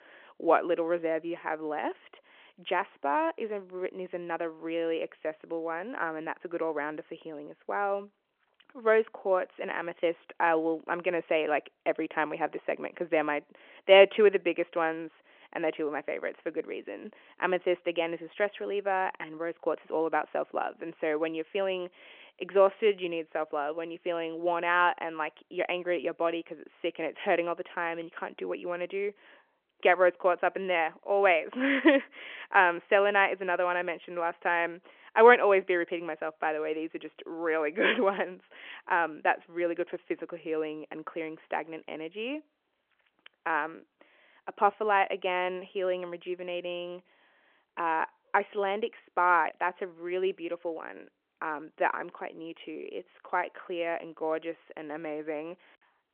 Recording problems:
phone-call audio

